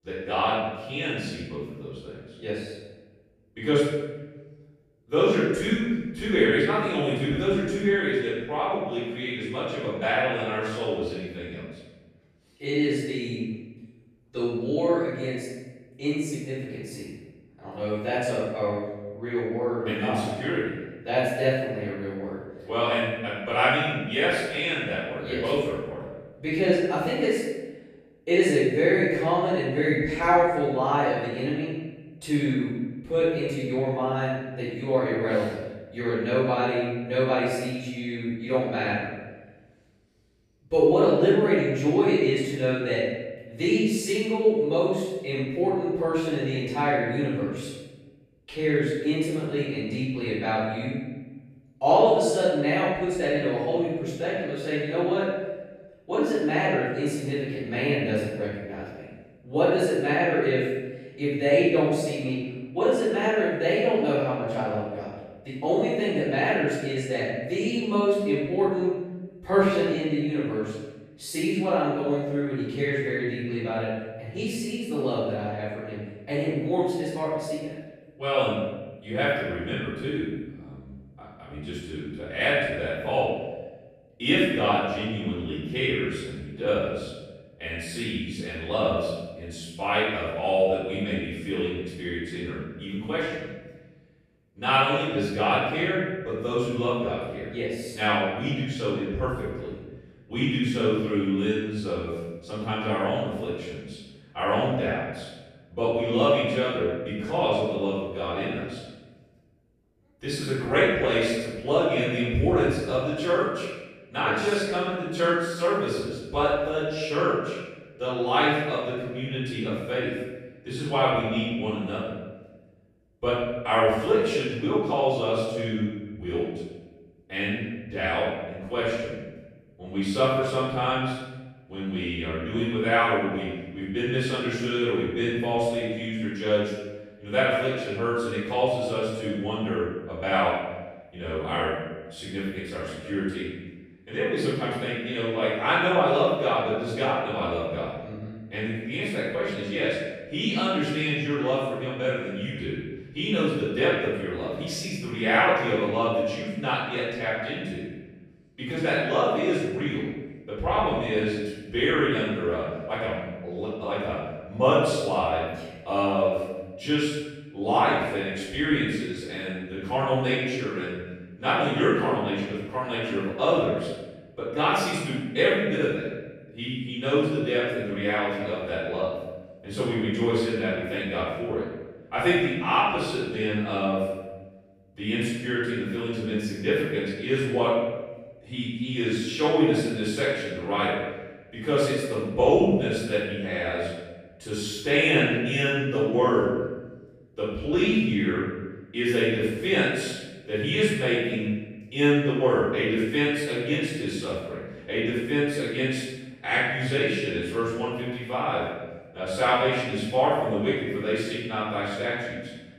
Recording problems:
room echo; strong; dies away in 1.1 s
off-mic speech; far

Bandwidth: 14.5 kHz